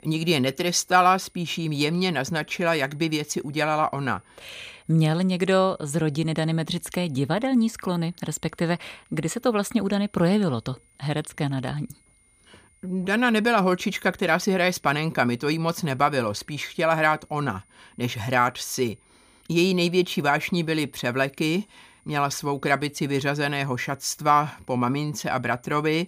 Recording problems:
high-pitched whine; faint; throughout; 9.5 kHz, 35 dB below the speech

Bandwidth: 15 kHz